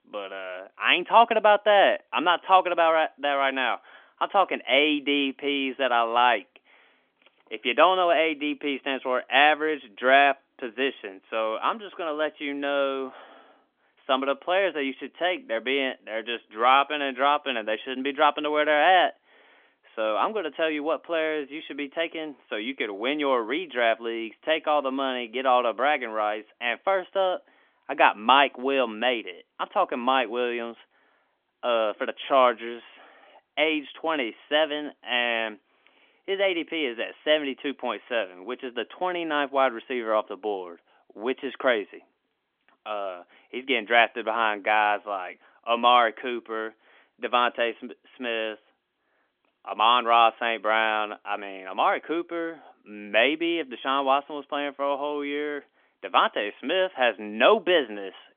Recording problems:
phone-call audio; nothing above 3.5 kHz

